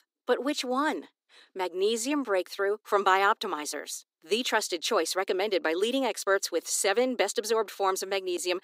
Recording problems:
thin; somewhat; fading below 300 Hz

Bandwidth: 15.5 kHz